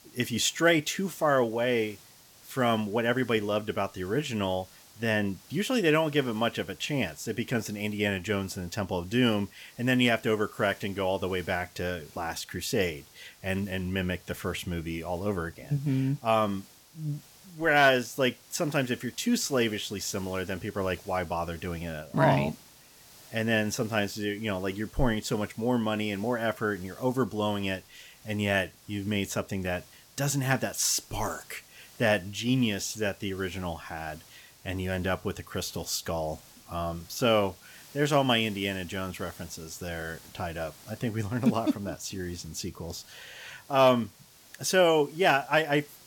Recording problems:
hiss; faint; throughout; 25 dB below the speech

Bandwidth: 17 kHz